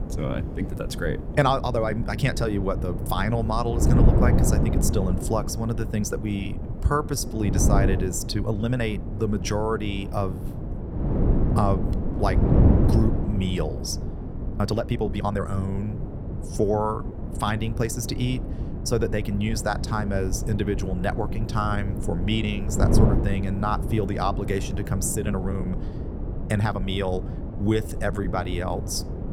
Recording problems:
wind noise on the microphone; heavy; 7 dB below the speech
uneven, jittery; strongly; from 1.5 to 28 s

